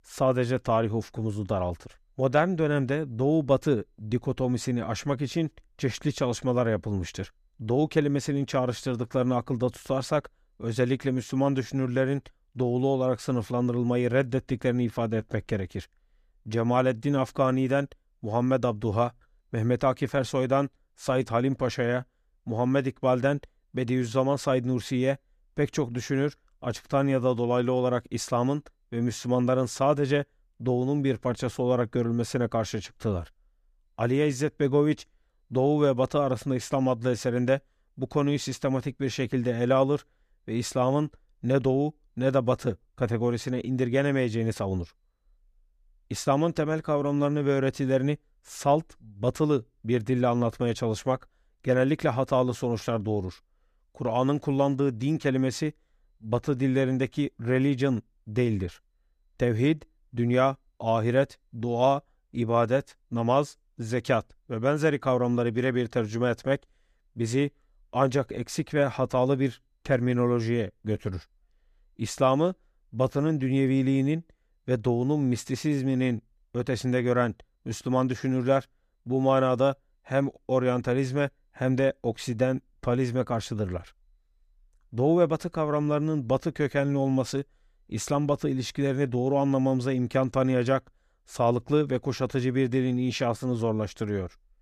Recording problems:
none

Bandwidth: 14.5 kHz